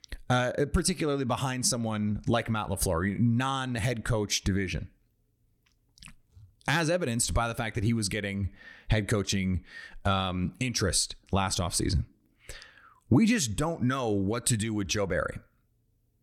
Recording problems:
none

